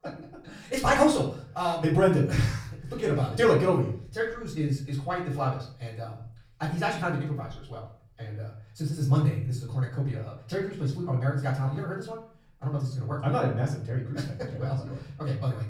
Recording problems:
off-mic speech; far
wrong speed, natural pitch; too fast; 1.6 times normal speed
echo of what is said; faint; throughout; 100 ms later, 20 dB below the speech
room echo; slight; dies away in 0.4 s

